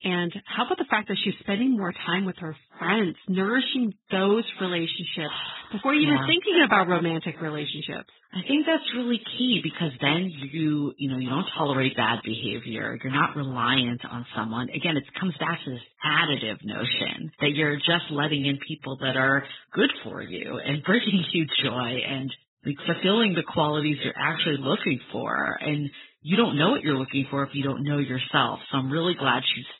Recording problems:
garbled, watery; badly; nothing above 4 kHz

